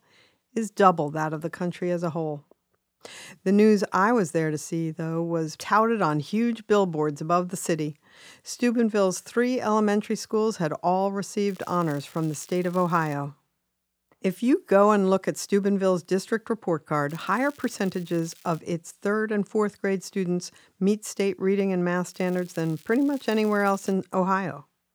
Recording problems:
crackling; faint; from 11 to 13 s, from 17 to 19 s and from 22 to 24 s; 25 dB below the speech

